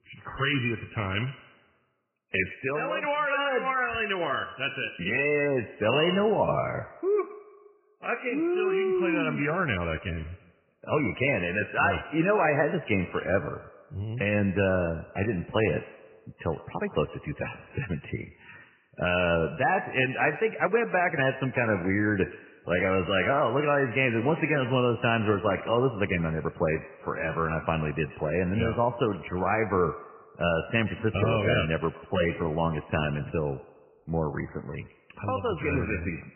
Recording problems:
garbled, watery; badly; nothing above 3 kHz
echo of what is said; noticeable; throughout; 120 ms later, 15 dB below the speech

